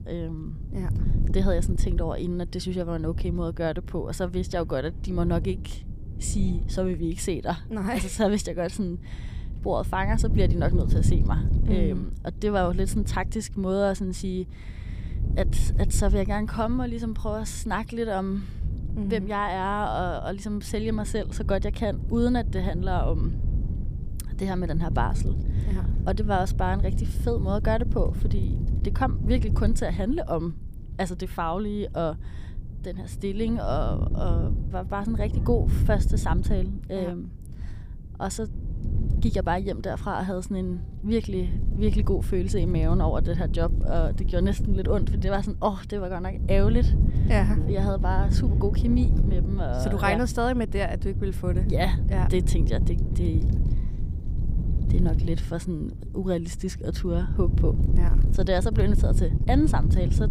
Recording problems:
wind noise on the microphone; occasional gusts; 10 dB below the speech

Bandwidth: 15 kHz